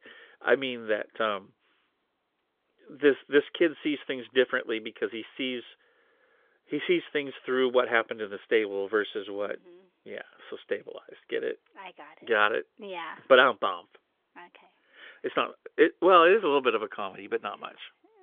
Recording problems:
phone-call audio; nothing above 3.5 kHz

